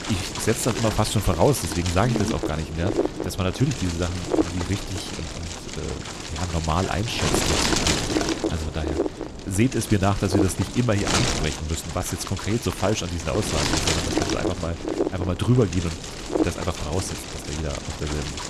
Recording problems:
wind noise on the microphone; heavy; as loud as the speech

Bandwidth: 13.5 kHz